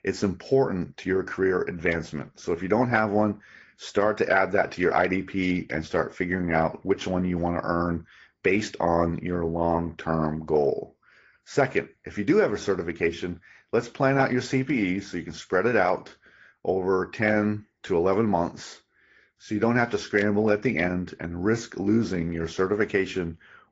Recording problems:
high frequencies cut off; noticeable; nothing above 7.5 kHz
garbled, watery; slightly

